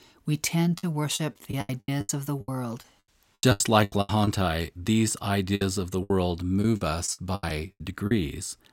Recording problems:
choppy; very; 15% of the speech affected

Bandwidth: 16 kHz